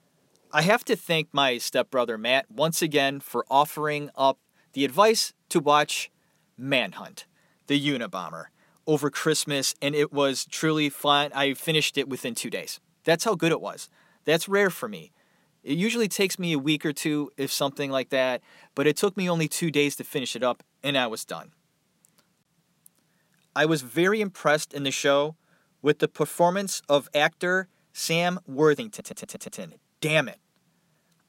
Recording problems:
audio stuttering; at 29 s

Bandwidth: 16 kHz